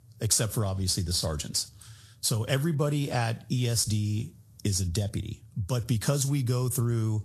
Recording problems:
garbled, watery; slightly; nothing above 12.5 kHz
squashed, flat; somewhat

